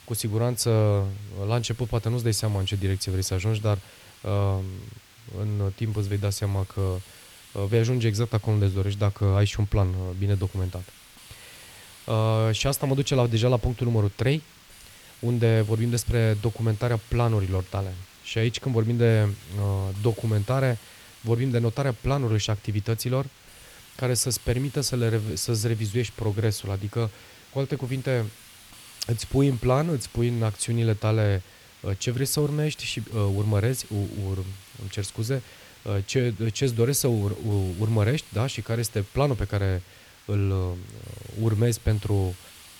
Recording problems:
hiss; faint; throughout; 20 dB below the speech

